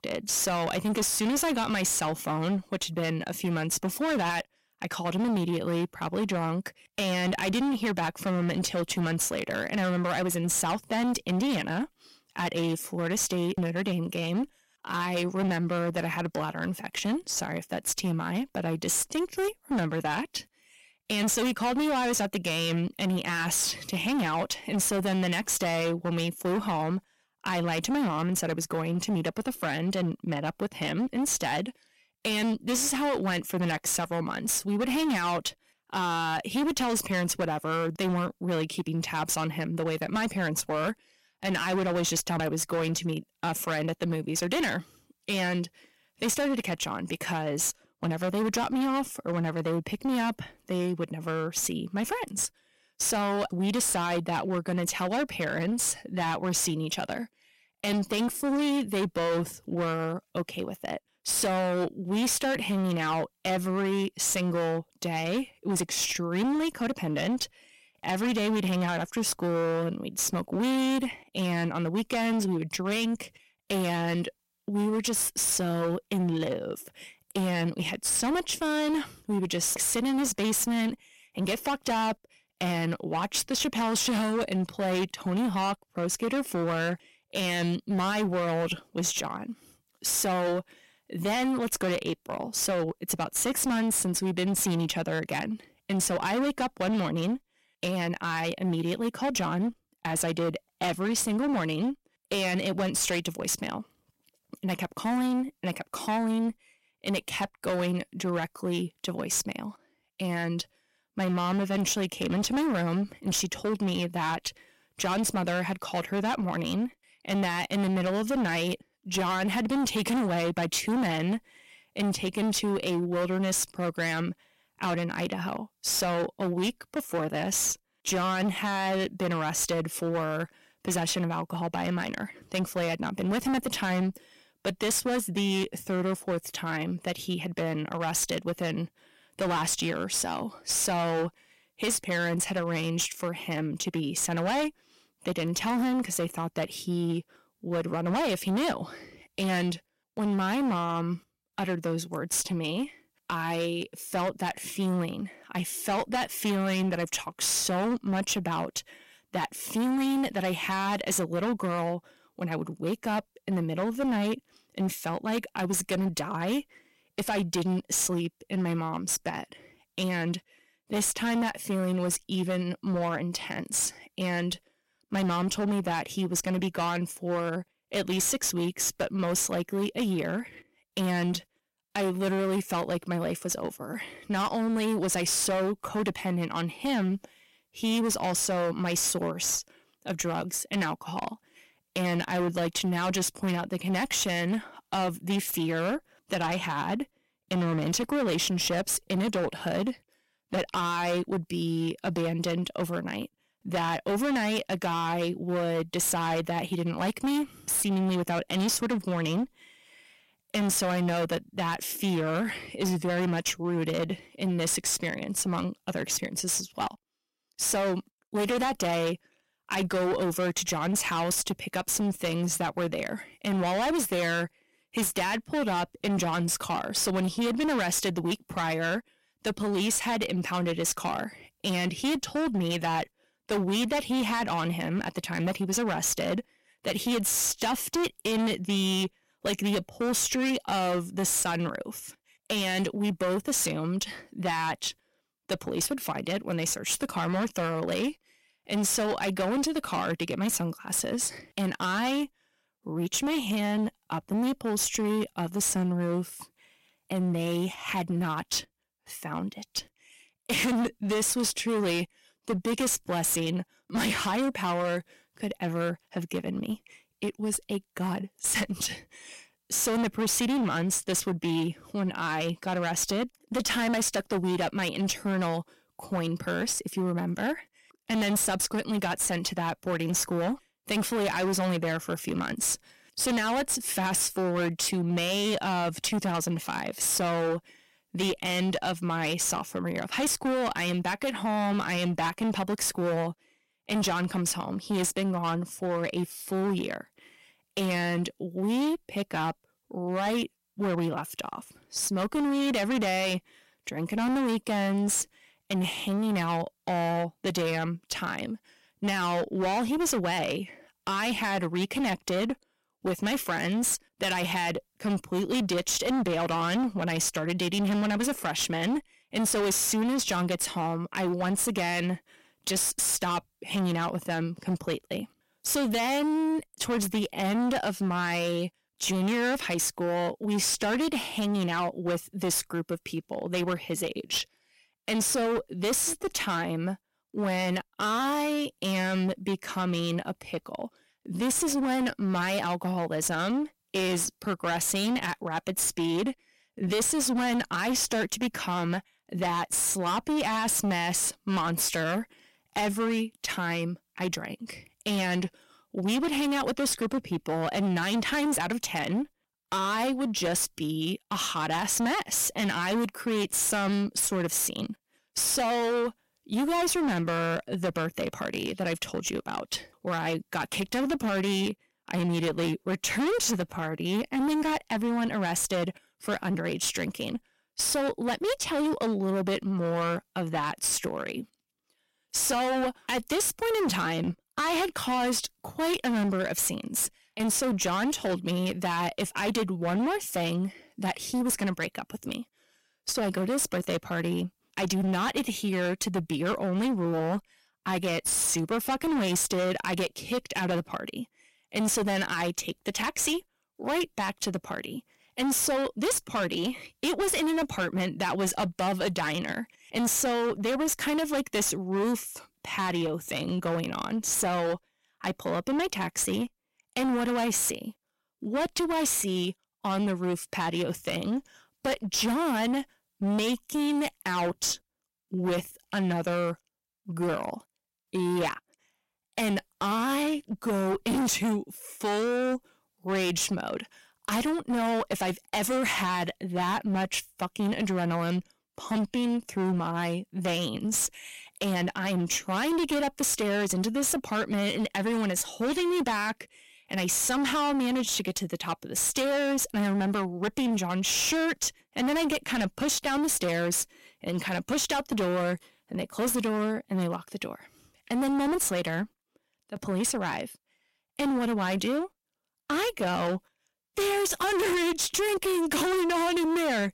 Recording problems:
distortion; heavy; 22% of the sound clipped

